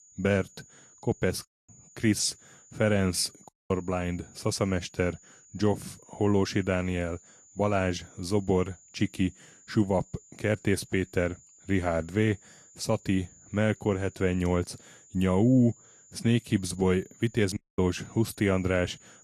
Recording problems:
garbled, watery; slightly; nothing above 11.5 kHz
high-pitched whine; faint; throughout; 7 kHz, 25 dB below the speech
audio cutting out; at 1.5 s, at 3.5 s and at 18 s

